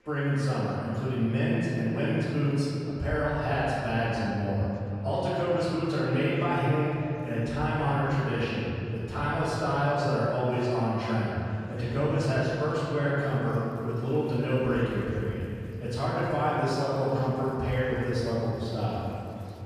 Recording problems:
room echo; strong; dies away in 2.6 s
off-mic speech; far
chatter from many people; faint; throughout; 25 dB below the speech

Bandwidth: 15 kHz